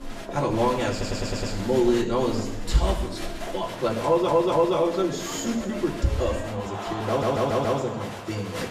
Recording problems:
off-mic speech; far
room echo; noticeable; dies away in 0.9 s
crowd noise; loud; throughout; 10 dB below the speech
audio stuttering; at 1 s, at 4 s and at 7 s

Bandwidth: 14.5 kHz